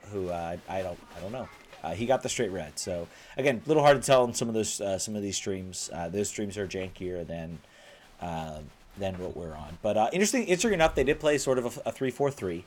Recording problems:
crowd noise; faint; throughout; 25 dB below the speech

